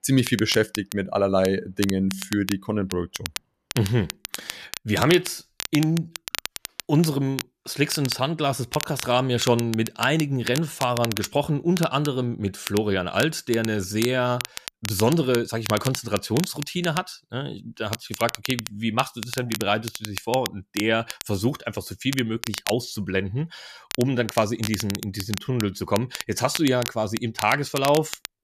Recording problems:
crackle, like an old record; loud; 9 dB below the speech

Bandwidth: 14.5 kHz